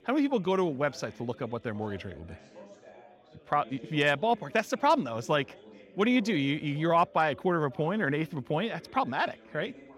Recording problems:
chatter from many people; faint; throughout; 20 dB below the speech

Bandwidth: 16 kHz